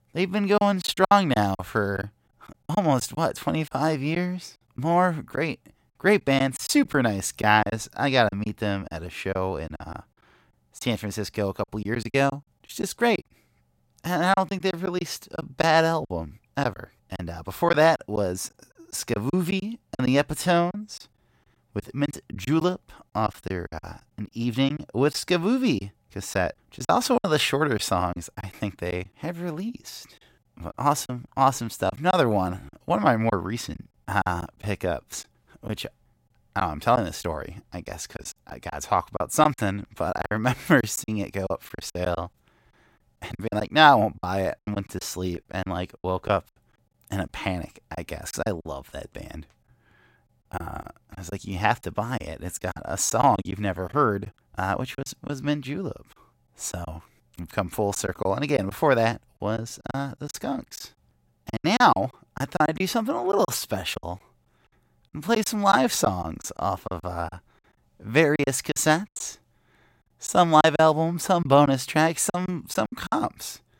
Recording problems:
choppy; very; 9% of the speech affected

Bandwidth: 16 kHz